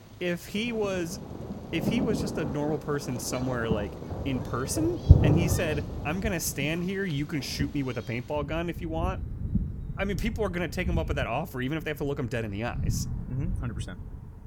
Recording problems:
rain or running water; loud; throughout; as loud as the speech

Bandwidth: 17.5 kHz